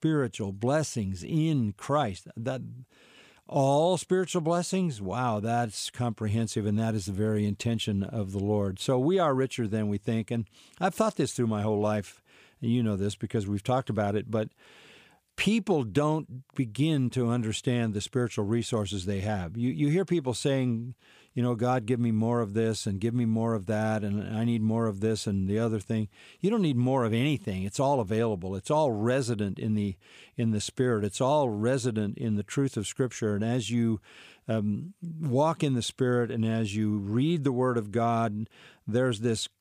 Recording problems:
none

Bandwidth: 15 kHz